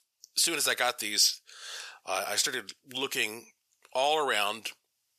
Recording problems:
thin; very; fading below 600 Hz

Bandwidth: 14.5 kHz